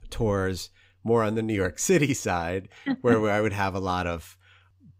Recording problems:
none

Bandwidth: 15.5 kHz